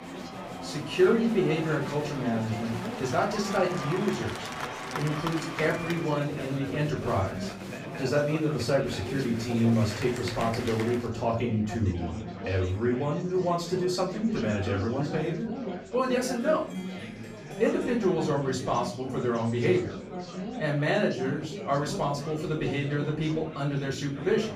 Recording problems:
off-mic speech; far
room echo; slight; dies away in 0.4 s
chatter from many people; loud; throughout; 8 dB below the speech
background music; faint; until 18 s; 25 dB below the speech

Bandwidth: 15.5 kHz